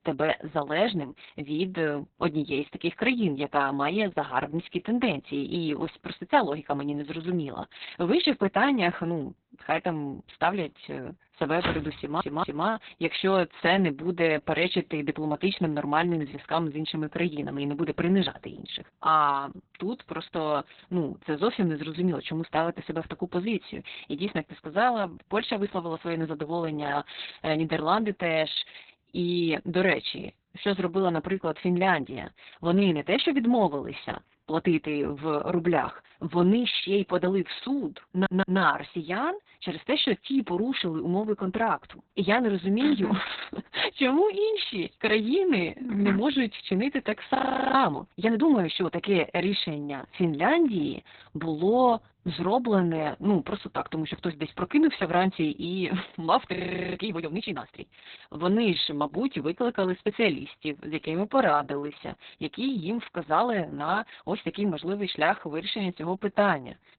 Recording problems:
garbled, watery; badly; nothing above 4 kHz
footsteps; noticeable; at 12 s; peak 7 dB below the speech
audio stuttering; at 12 s and at 38 s
audio freezing; at 47 s and at 57 s

